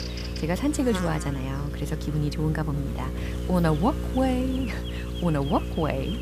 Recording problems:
electrical hum; loud; throughout; 60 Hz, 8 dB below the speech

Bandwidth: 14.5 kHz